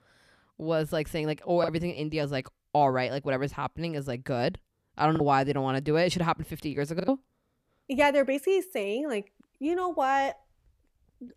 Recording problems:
choppy; occasionally; 2% of the speech affected

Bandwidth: 14.5 kHz